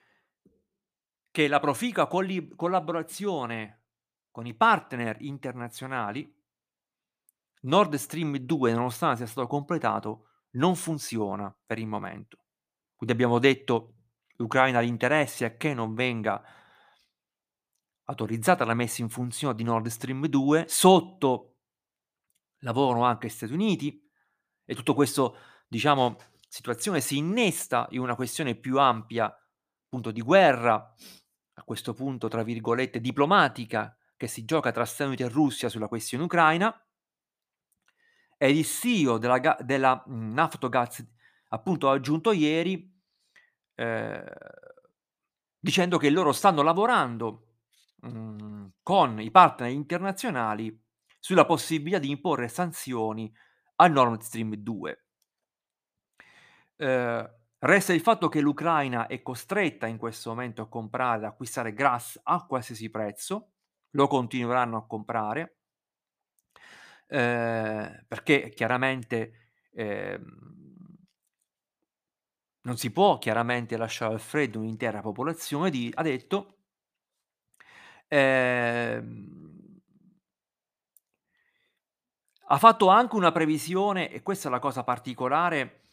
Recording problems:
none

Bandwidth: 15 kHz